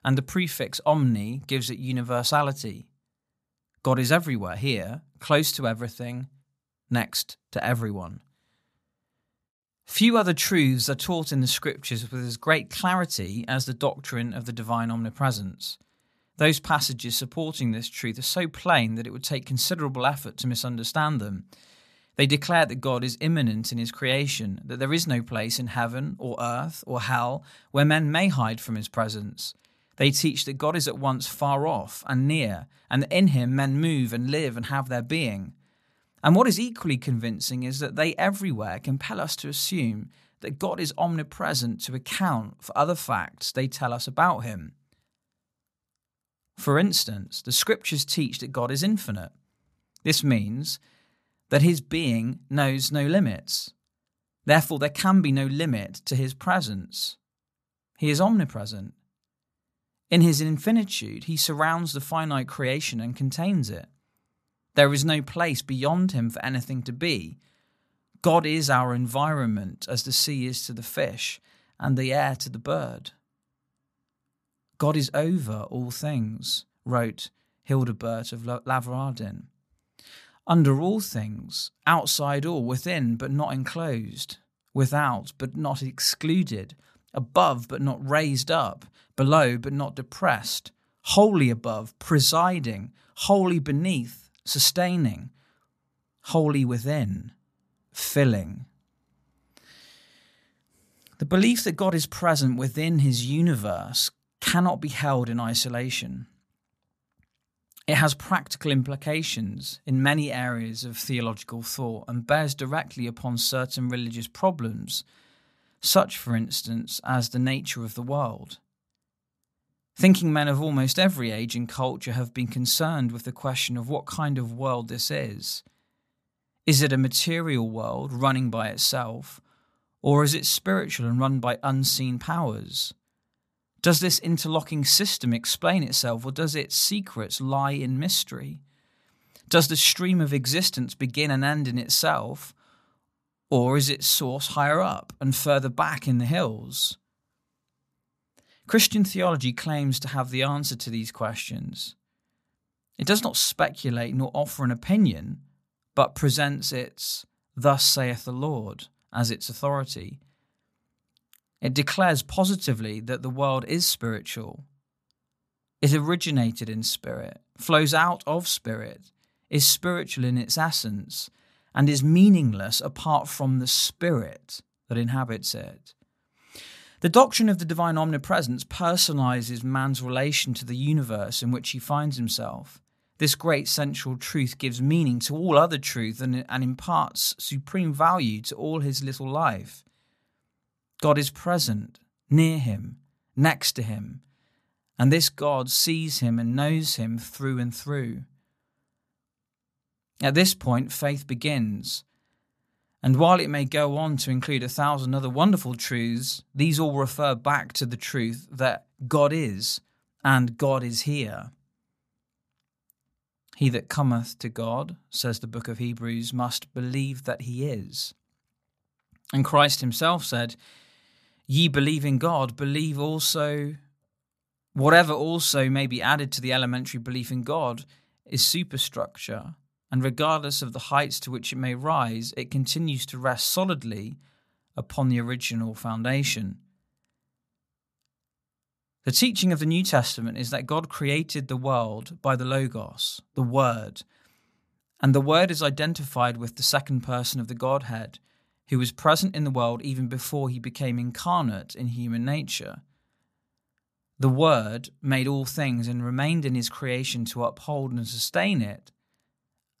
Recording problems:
none

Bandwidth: 14.5 kHz